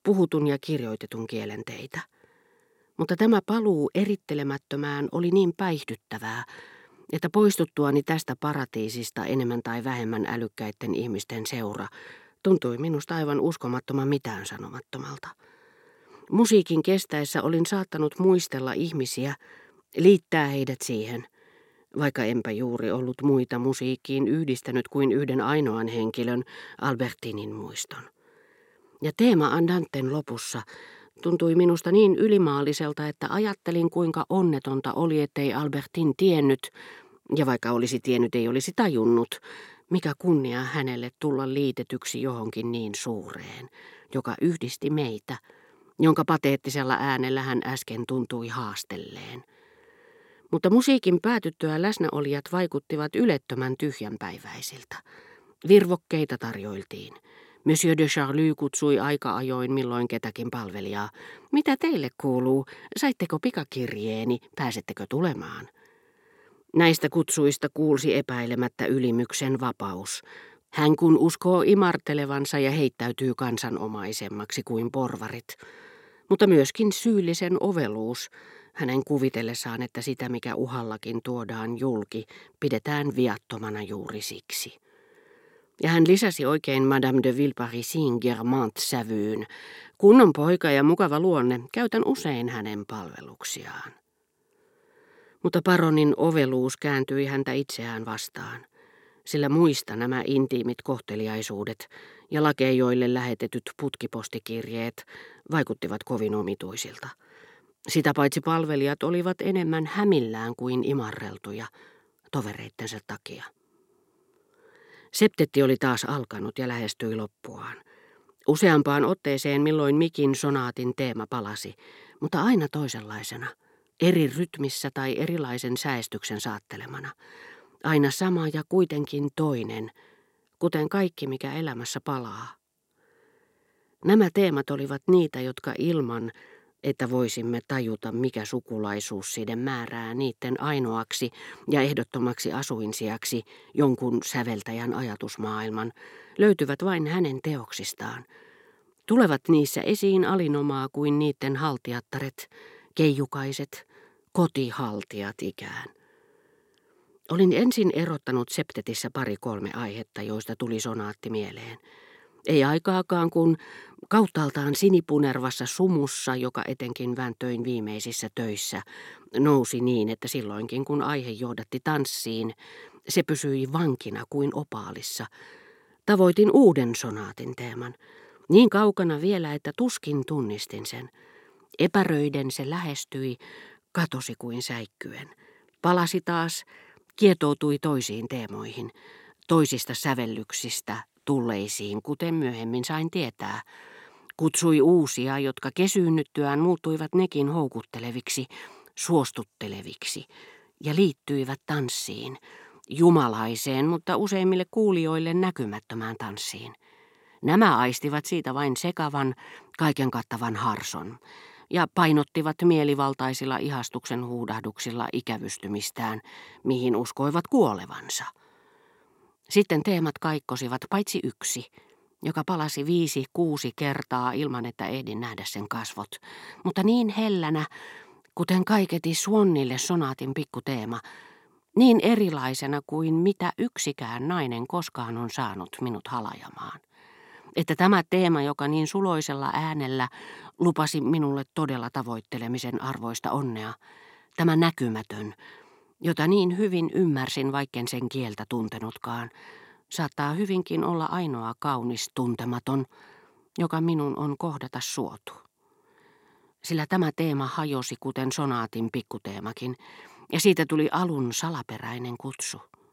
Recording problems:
none

